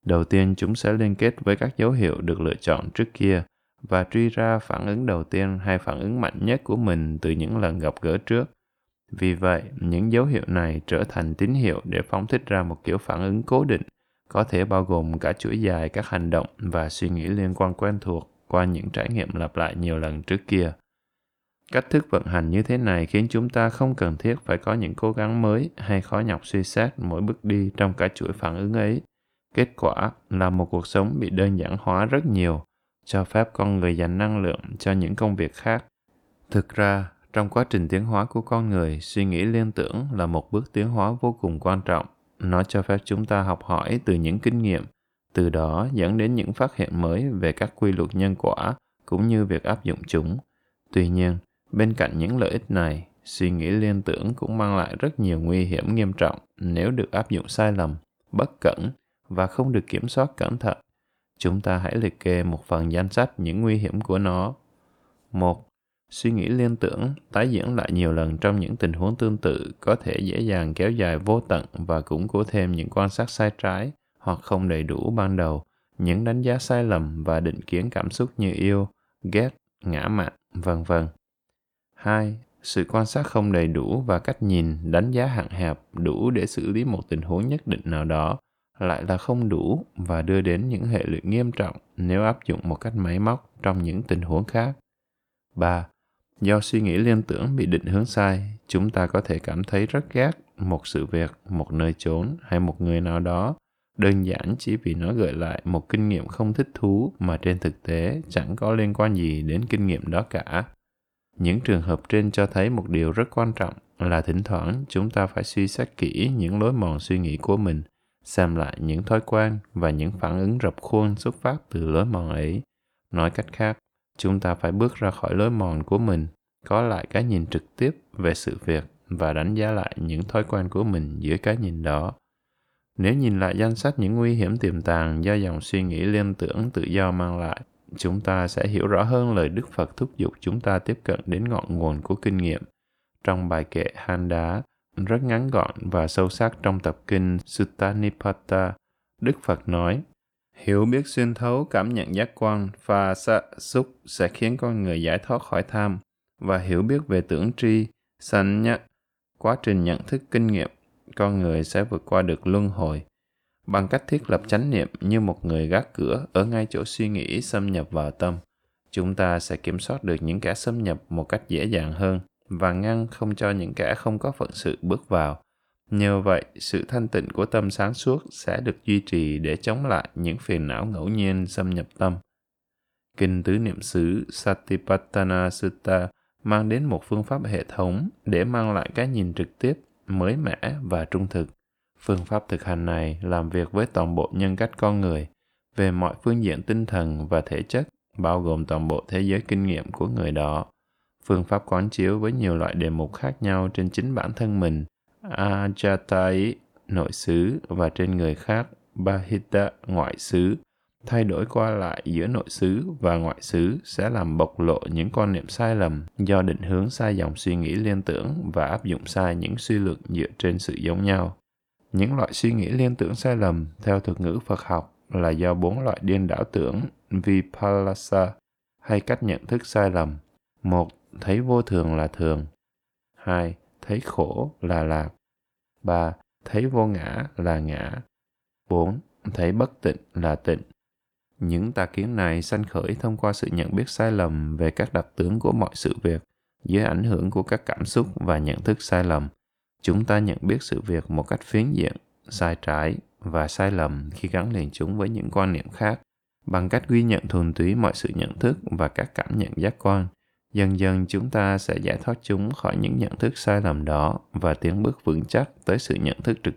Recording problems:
none

